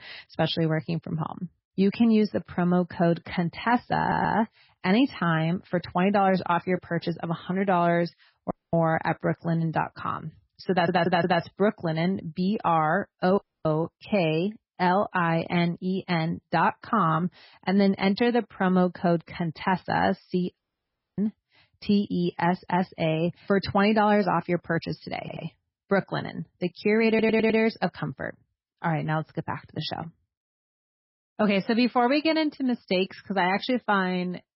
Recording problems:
garbled, watery; badly; nothing above 5.5 kHz
audio stuttering; 4 times, first at 4 s
audio cutting out; at 8.5 s, at 13 s and at 21 s for 0.5 s

